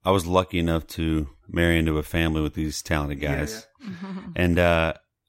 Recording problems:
none

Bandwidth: 16 kHz